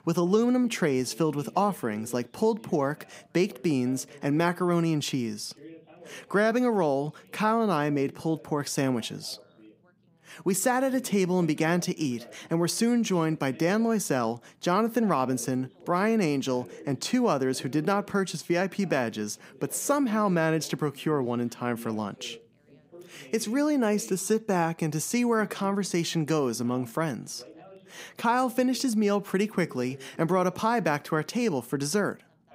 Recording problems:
background chatter; faint; throughout; 2 voices, 25 dB below the speech

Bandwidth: 15.5 kHz